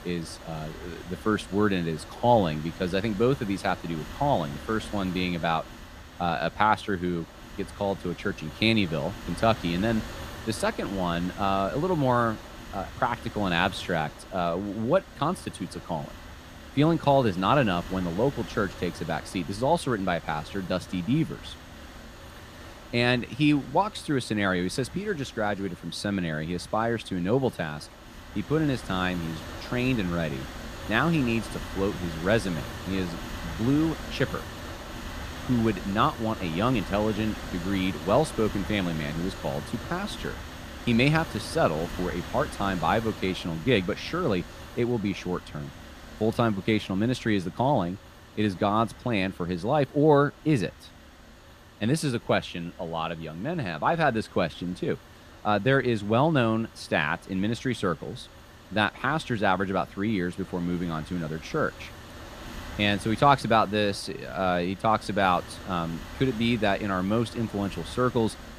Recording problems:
wind noise on the microphone; occasional gusts; 15 dB below the speech

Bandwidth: 15 kHz